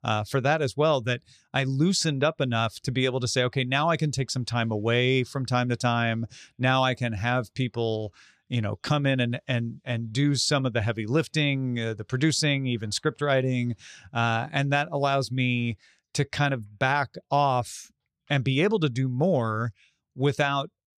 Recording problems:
none

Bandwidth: 14.5 kHz